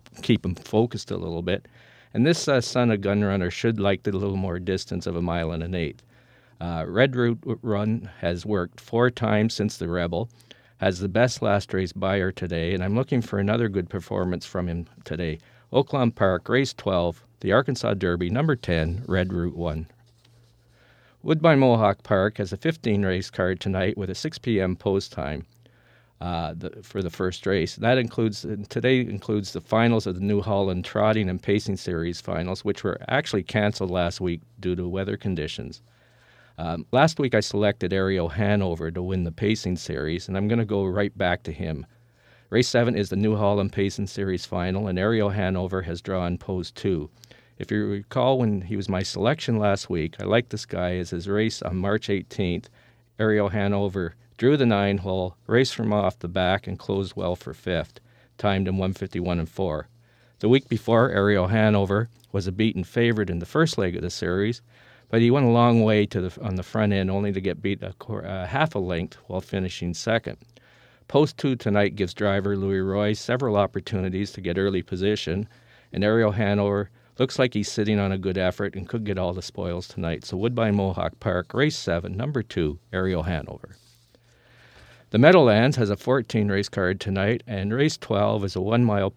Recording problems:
uneven, jittery; strongly; from 10 s to 1:10

